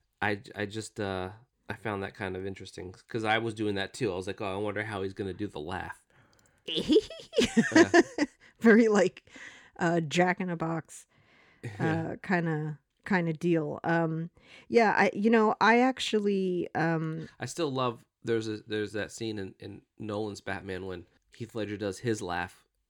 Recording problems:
none

